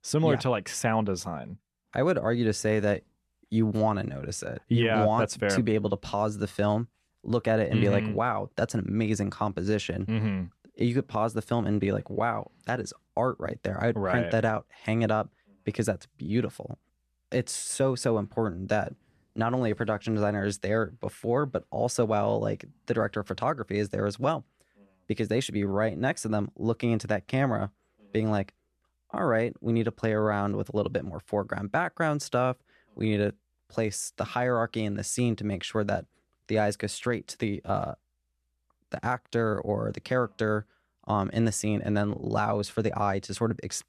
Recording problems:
none

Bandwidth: 14 kHz